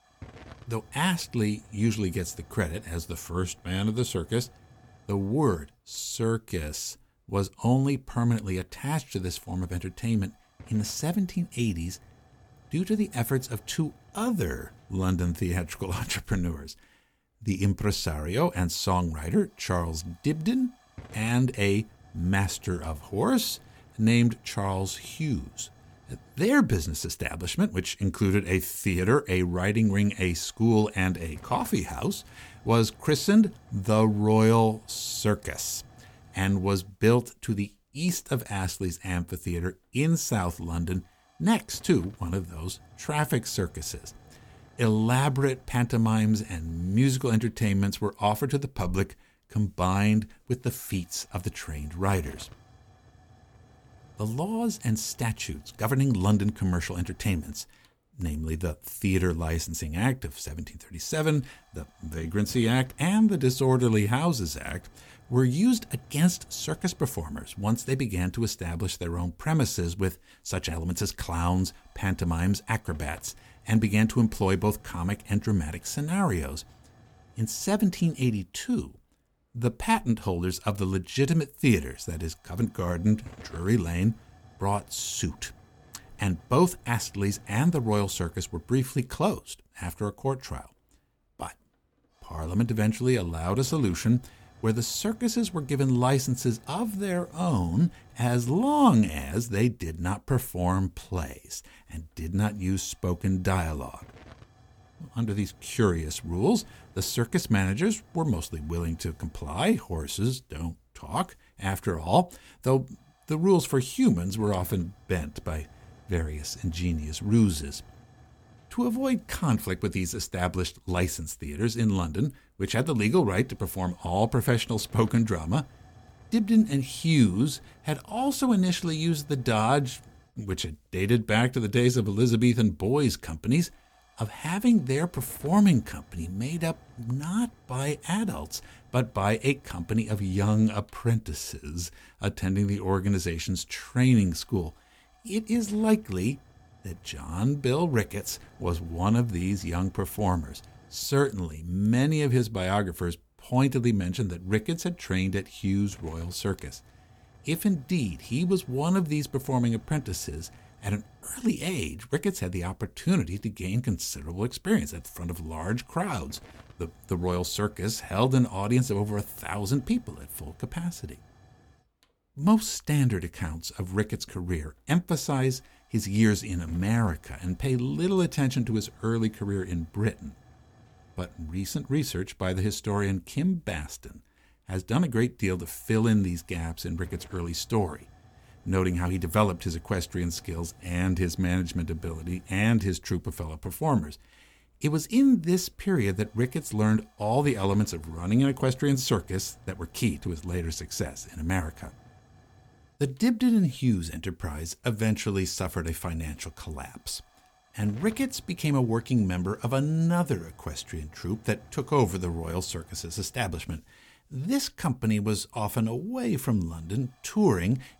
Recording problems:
hiss; faint; throughout; 25 dB below the speech

